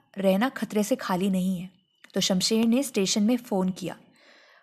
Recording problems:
none

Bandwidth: 14 kHz